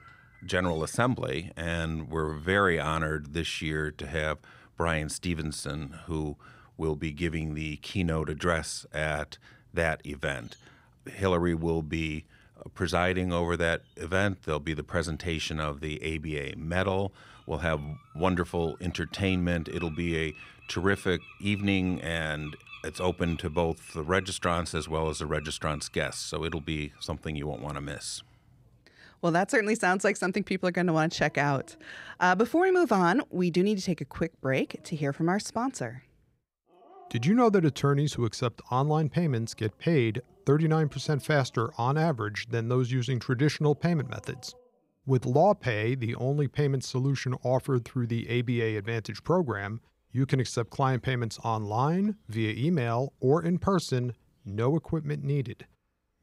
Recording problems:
animal sounds; faint; throughout; 25 dB below the speech

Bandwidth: 15.5 kHz